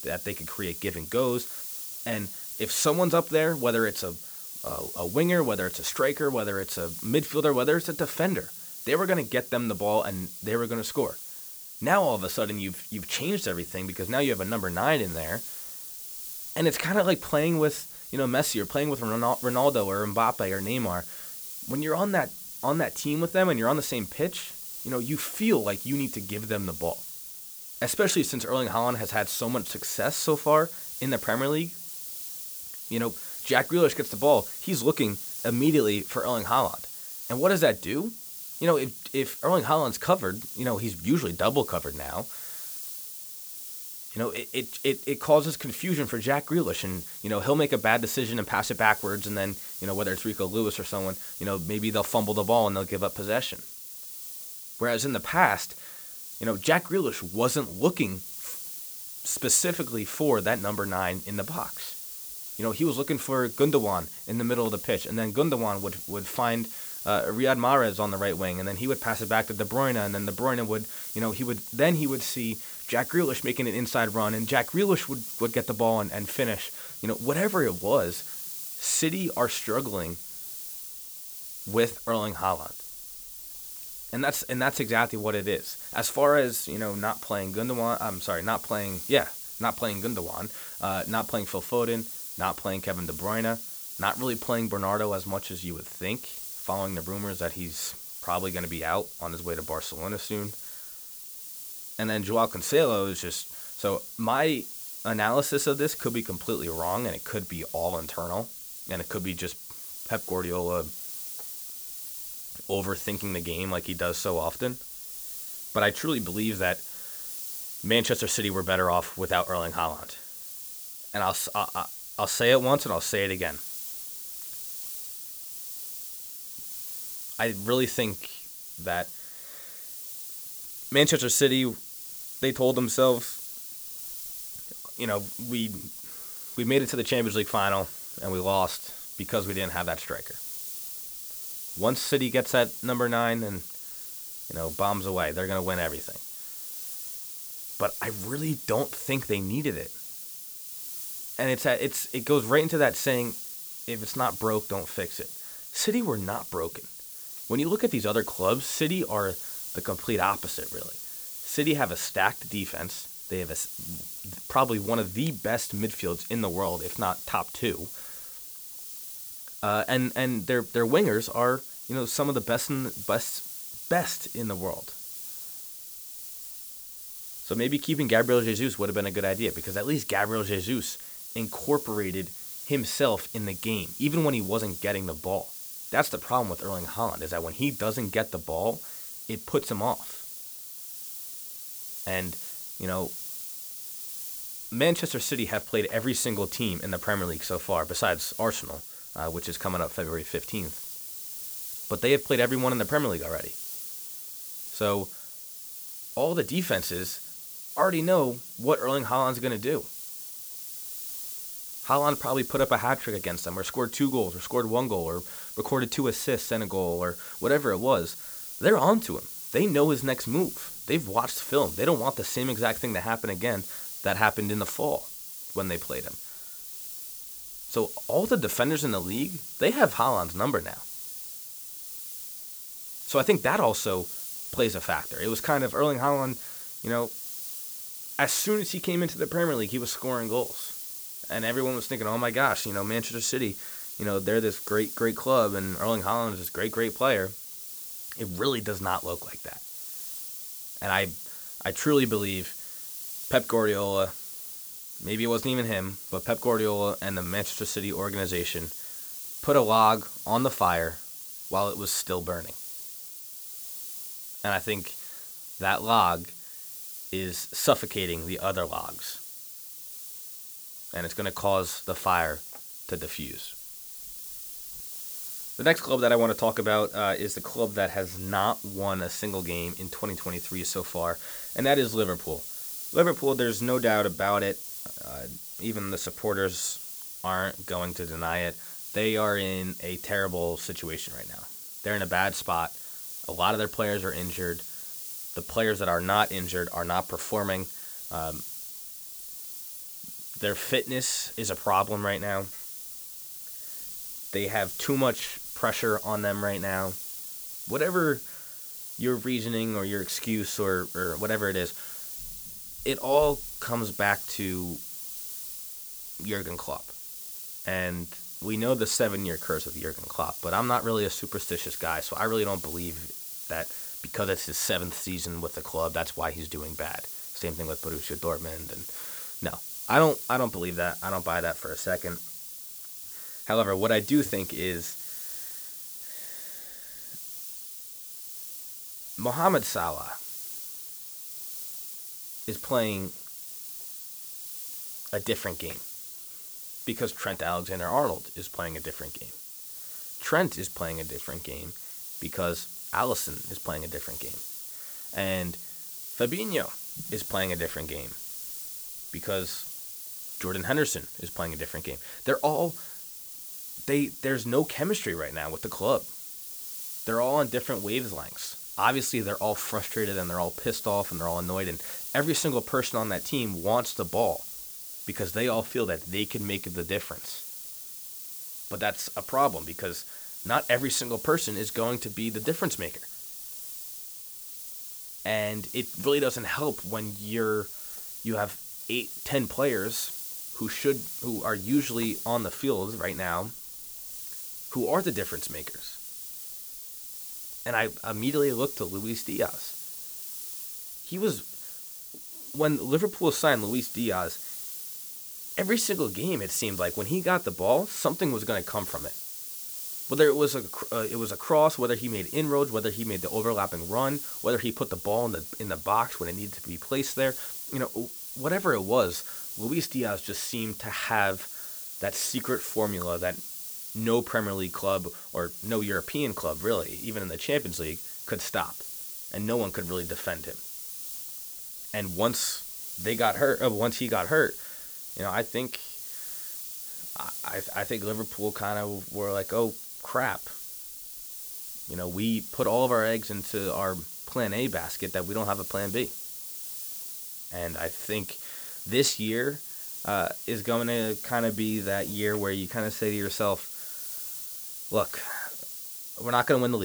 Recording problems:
hiss; loud; throughout; 8 dB below the speech
abrupt cut into speech; at the end

